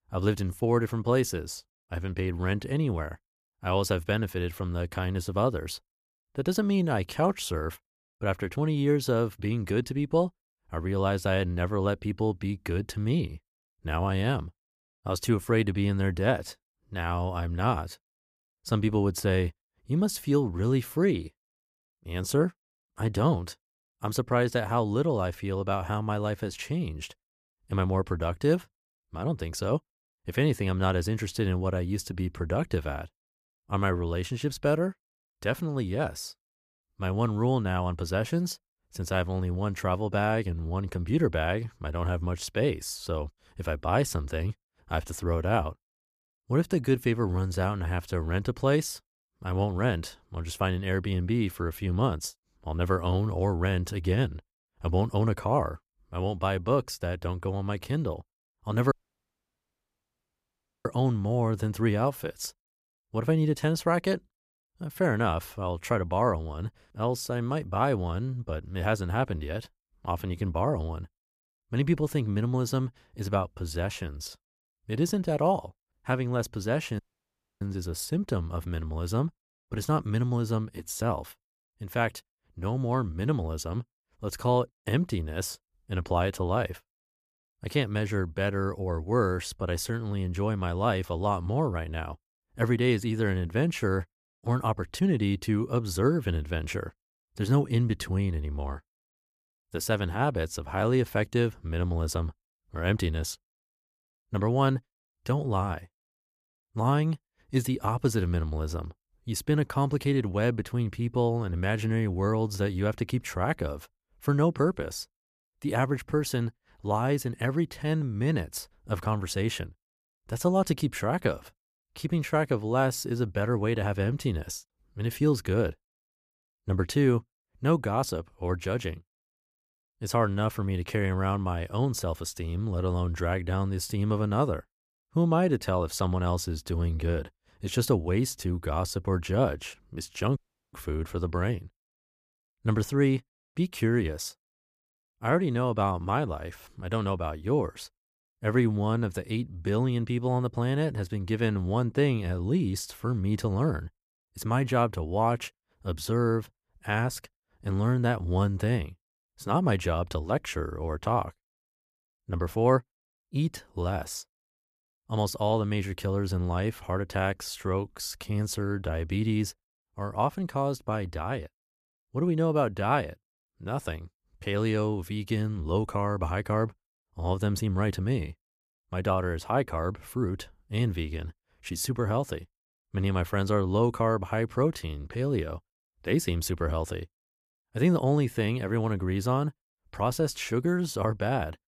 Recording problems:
audio cutting out; at 59 s for 2 s, at 1:17 for 0.5 s and at 2:20

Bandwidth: 14.5 kHz